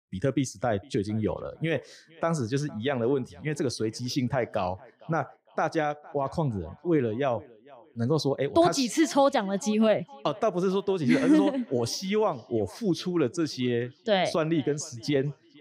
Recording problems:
echo of what is said; faint; throughout; 460 ms later, 25 dB below the speech

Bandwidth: 15.5 kHz